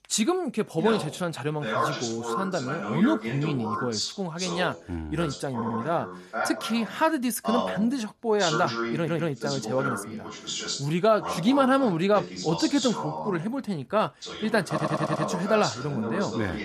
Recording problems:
voice in the background; loud; throughout; 5 dB below the speech
audio stuttering; at 5.5 s, at 9 s and at 15 s

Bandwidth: 13.5 kHz